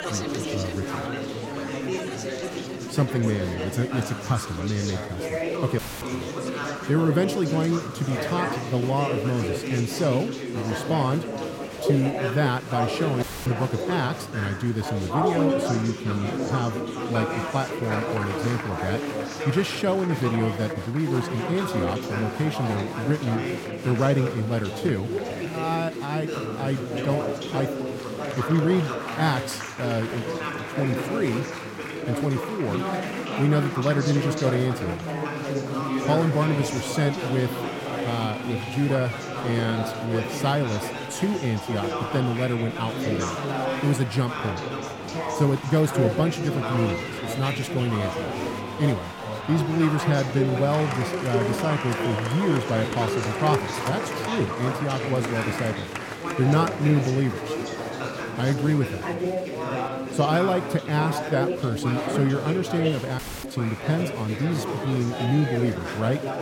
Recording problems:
chatter from many people; loud; throughout; 3 dB below the speech
audio cutting out; at 6 s, at 13 s and at 1:03

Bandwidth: 16.5 kHz